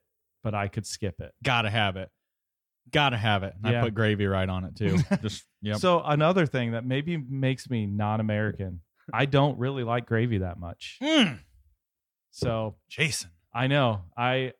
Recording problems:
none

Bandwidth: 18 kHz